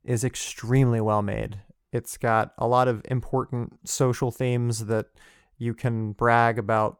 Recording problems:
none

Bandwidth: 17.5 kHz